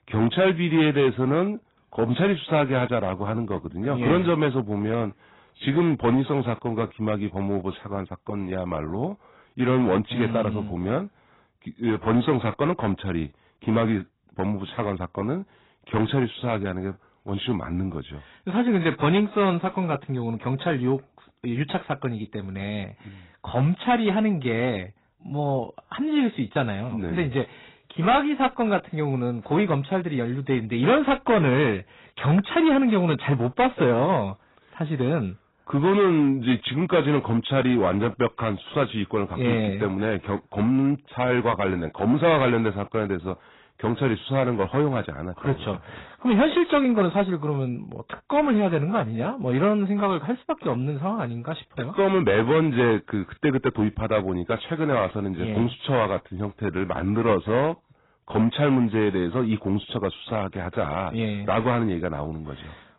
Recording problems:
garbled, watery; badly; nothing above 4 kHz
distortion; slight; 4% of the sound clipped

